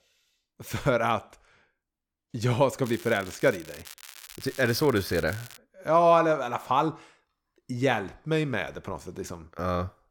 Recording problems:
crackling; noticeable; from 3 to 5.5 s; 20 dB below the speech

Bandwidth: 17 kHz